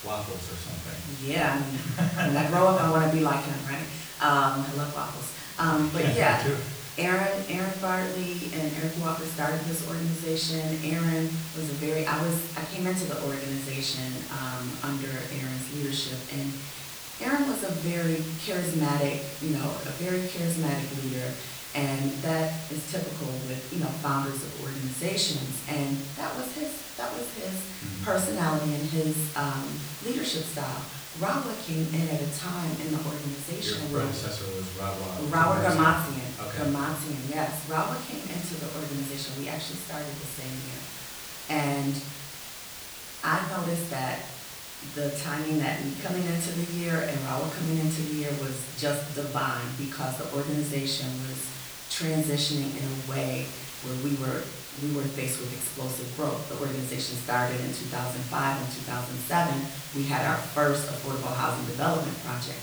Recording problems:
off-mic speech; far
room echo; slight; dies away in 0.6 s
hiss; loud; throughout; 9 dB below the speech

